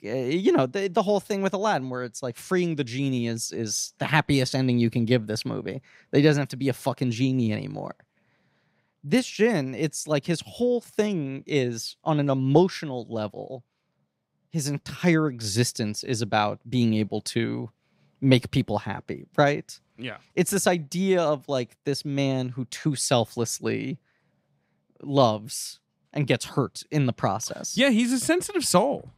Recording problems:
none

